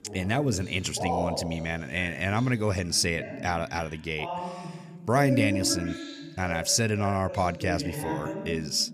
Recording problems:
voice in the background; loud; throughout; 8 dB below the speech

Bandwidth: 15 kHz